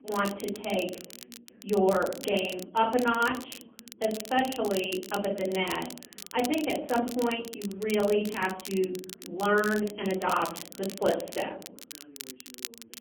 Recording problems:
phone-call audio; poor line; nothing above 3 kHz
off-mic speech; far
room echo; slight; dies away in 0.6 s
muffled; very slightly; fading above 4 kHz
crackle, like an old record; noticeable; 15 dB below the speech
voice in the background; faint; throughout; 25 dB below the speech

